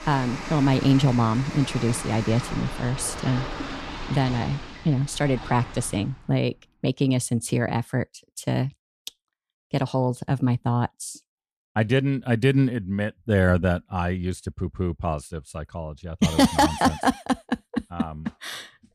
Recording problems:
rain or running water; noticeable; until 6 s; 10 dB below the speech

